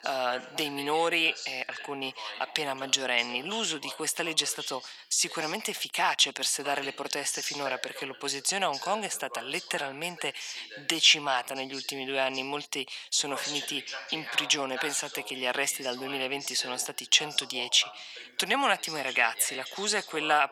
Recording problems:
thin; very; fading below 800 Hz
voice in the background; noticeable; throughout; 10 dB below the speech

